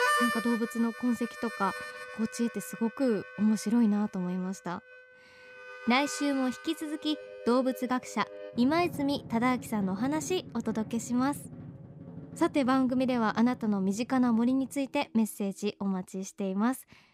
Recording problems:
background music; noticeable; throughout; 10 dB below the speech

